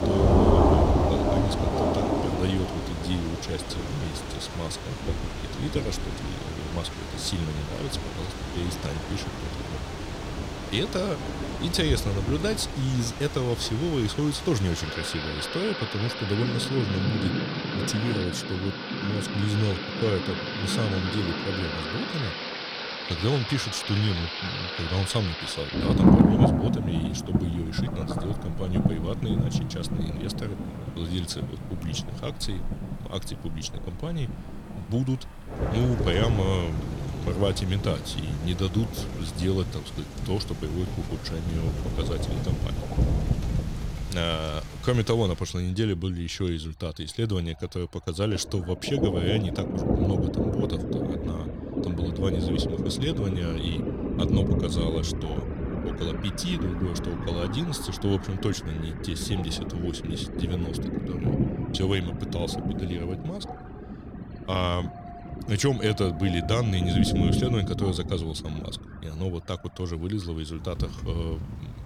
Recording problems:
rain or running water; very loud; throughout; as loud as the speech

